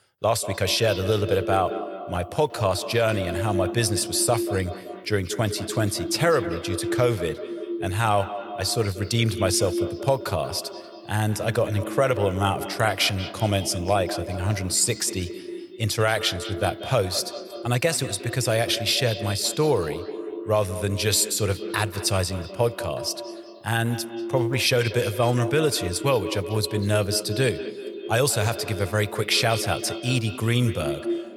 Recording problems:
echo of what is said; strong; throughout; 180 ms later, 9 dB below the speech

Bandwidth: 18.5 kHz